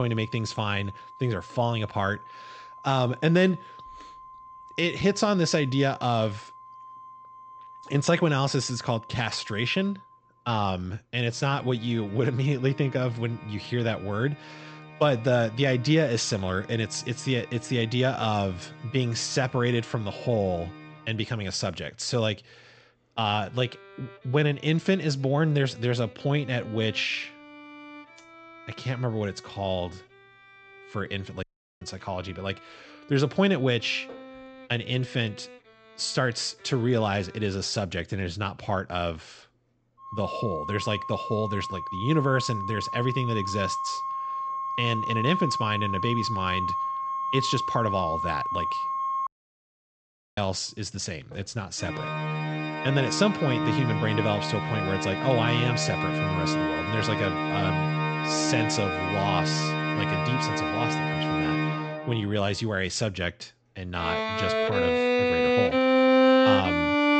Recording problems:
high frequencies cut off; noticeable; nothing above 8 kHz
background music; very loud; throughout; 1 dB above the speech
abrupt cut into speech; at the start
audio cutting out; at 31 s and at 49 s for 1 s

